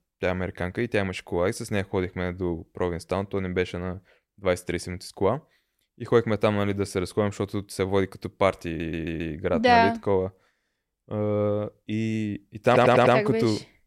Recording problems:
audio stuttering; at 8.5 s and at 13 s

